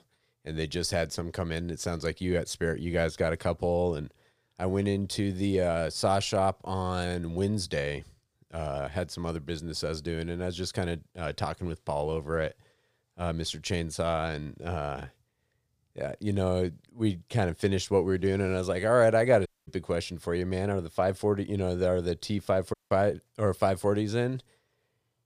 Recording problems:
audio cutting out; at 19 s and at 23 s

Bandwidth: 15 kHz